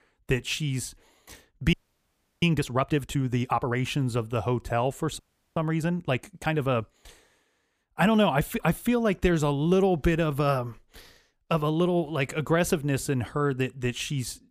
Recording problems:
audio freezing; at 1.5 s for 0.5 s and at 5 s

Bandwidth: 15 kHz